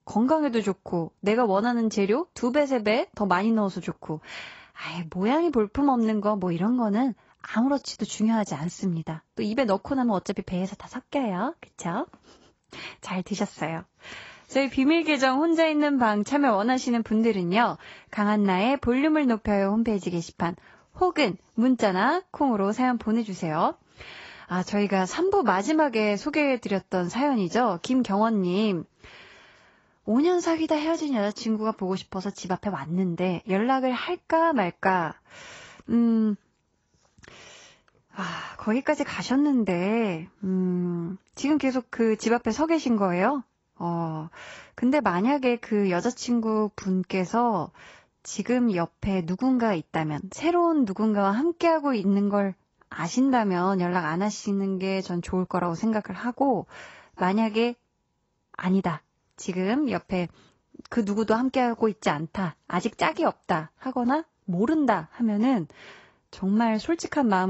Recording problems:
garbled, watery; badly; nothing above 8 kHz
abrupt cut into speech; at the end

